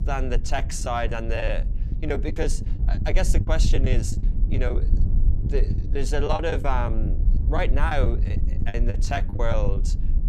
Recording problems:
low rumble; noticeable; throughout; 15 dB below the speech
choppy; very; 11% of the speech affected

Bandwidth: 14 kHz